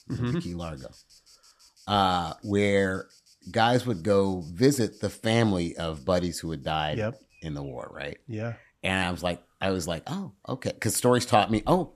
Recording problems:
animal sounds; faint; throughout; 30 dB below the speech

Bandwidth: 14.5 kHz